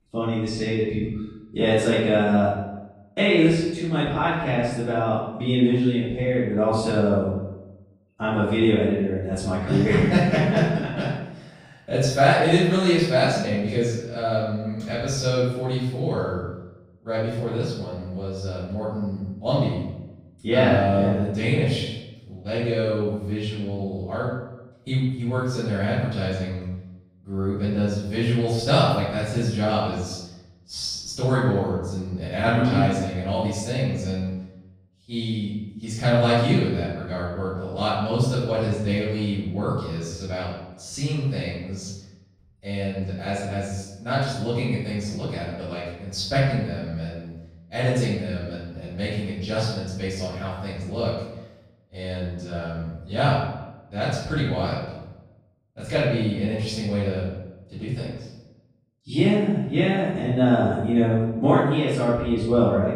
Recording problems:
room echo; strong; dies away in 0.8 s
off-mic speech; far

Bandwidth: 15.5 kHz